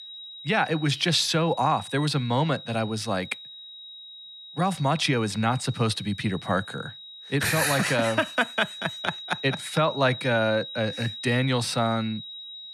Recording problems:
high-pitched whine; noticeable; throughout; 4 kHz, 15 dB below the speech

